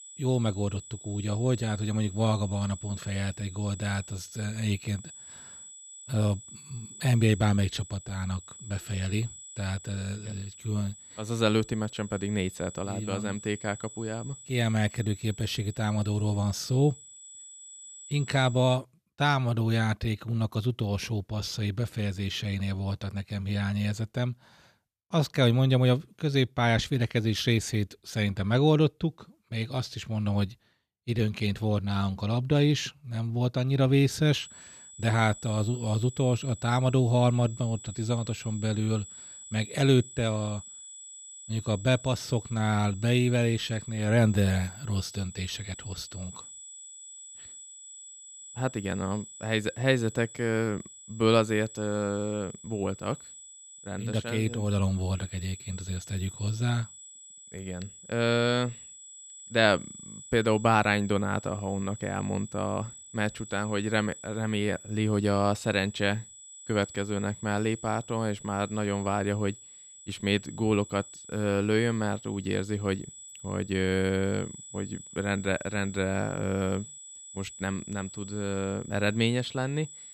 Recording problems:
high-pitched whine; noticeable; until 19 s and from 34 s on; 8 kHz, 15 dB below the speech

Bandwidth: 14.5 kHz